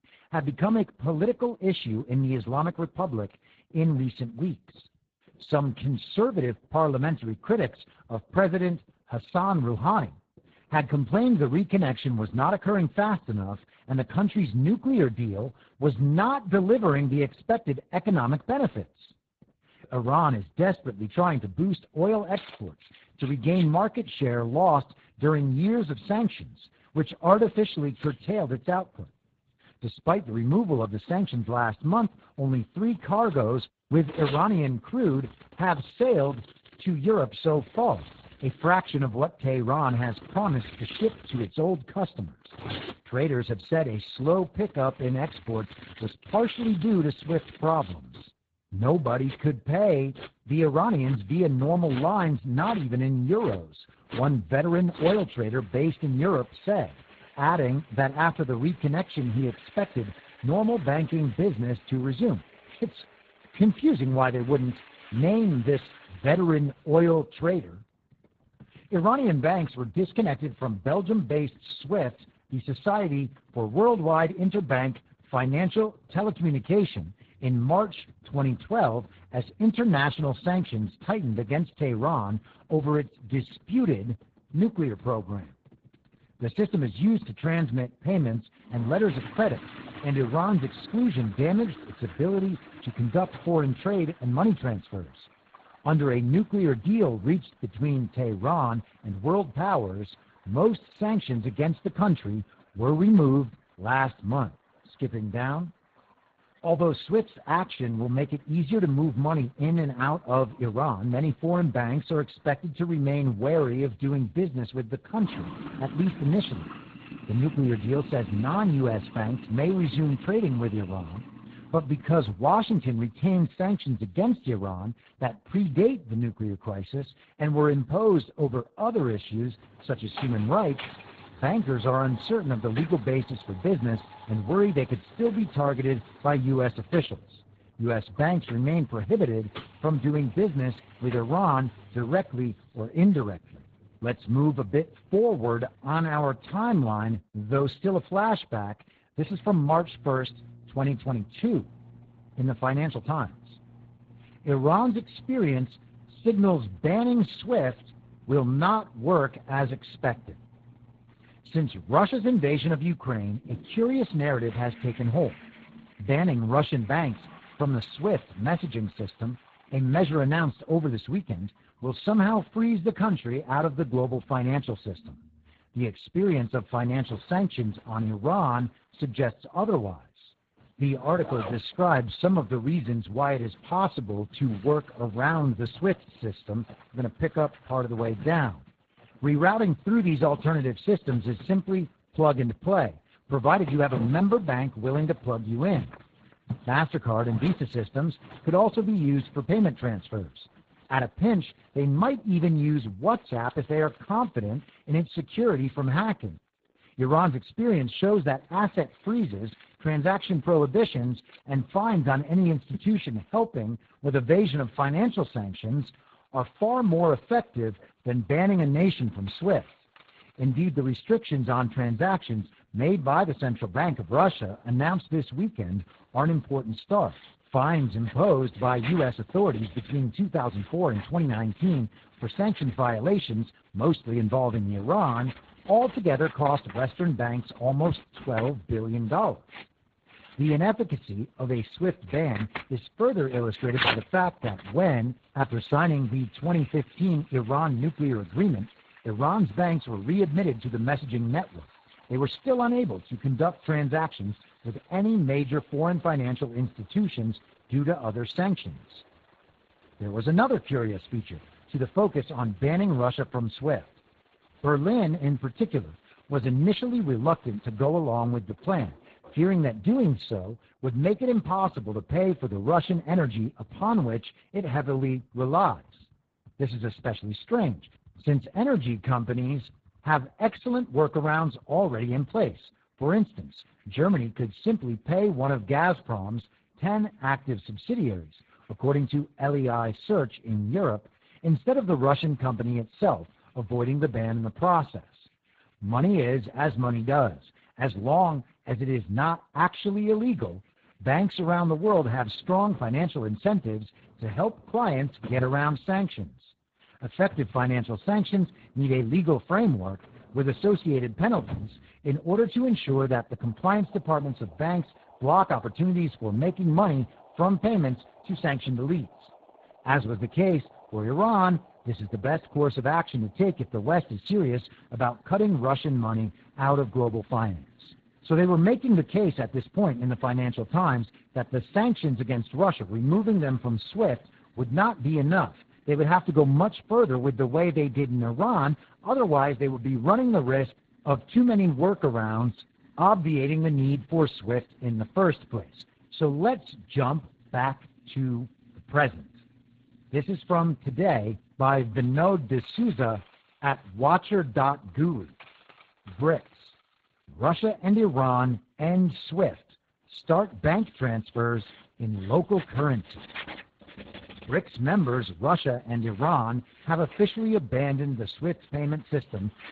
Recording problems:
garbled, watery; badly
household noises; faint; throughout; 20 dB below the speech

